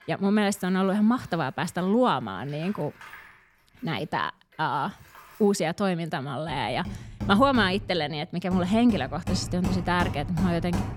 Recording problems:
machinery noise; loud; throughout; 10 dB below the speech

